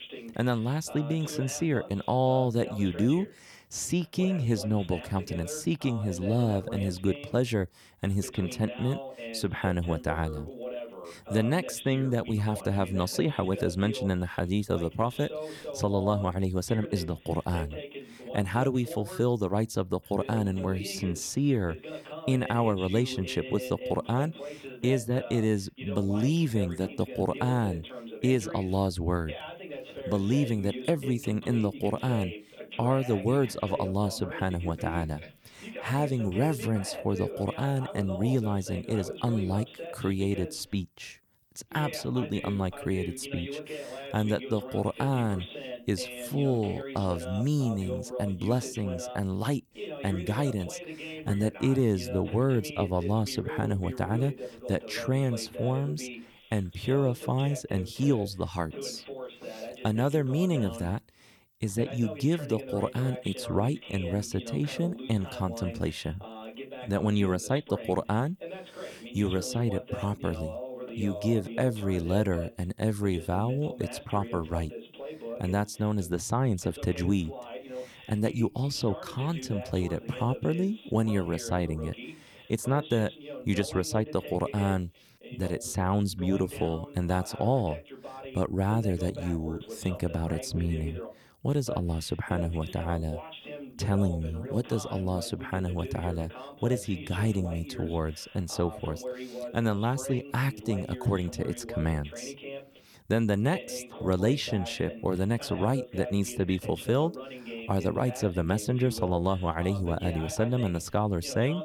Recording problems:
voice in the background; noticeable; throughout; 10 dB below the speech

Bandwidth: 19 kHz